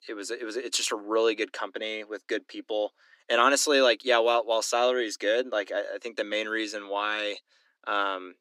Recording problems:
thin; somewhat; fading below 250 Hz

